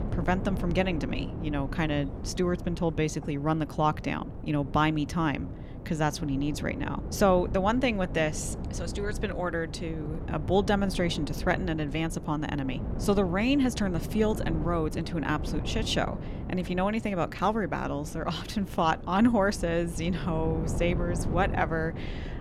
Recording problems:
wind noise on the microphone; occasional gusts; 15 dB below the speech

